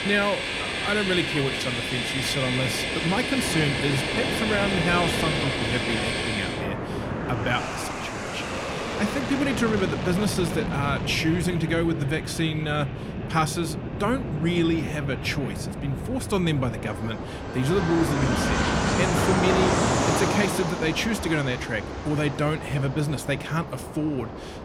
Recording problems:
train or aircraft noise; loud; throughout; 1 dB below the speech

